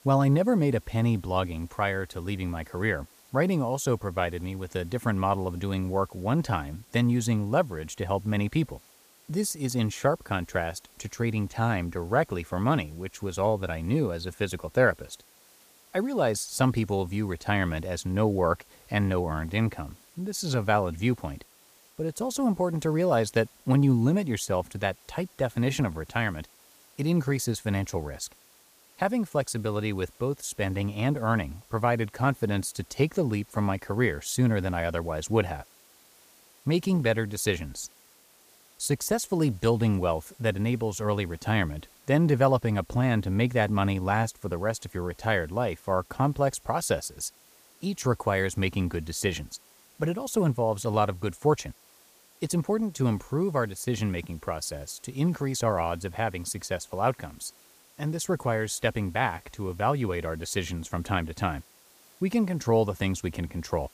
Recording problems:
hiss; faint; throughout; 25 dB below the speech

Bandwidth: 15 kHz